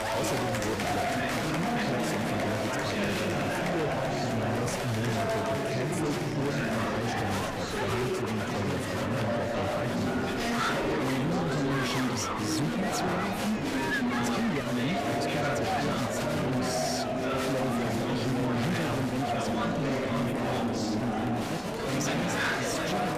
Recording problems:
distortion; slight; 23% of the sound clipped
murmuring crowd; very loud; throughout; 4 dB above the speech
animal sounds; very faint; throughout; 15 dB below the speech

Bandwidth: 15 kHz